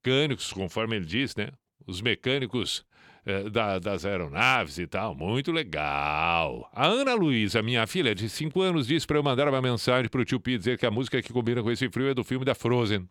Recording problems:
none

